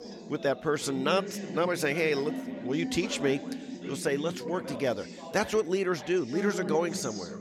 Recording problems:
background chatter; loud; throughout; 3 voices, 8 dB below the speech

